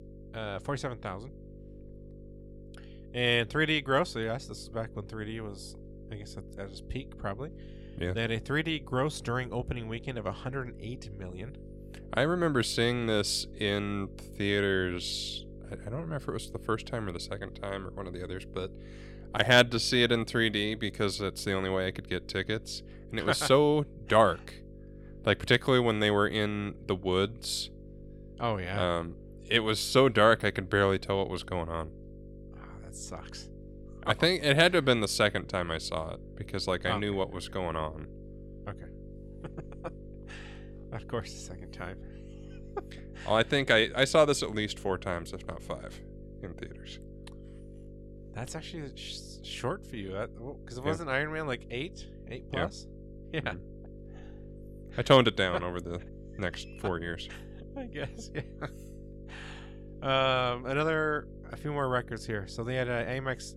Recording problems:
electrical hum; faint; throughout; 50 Hz, 25 dB below the speech

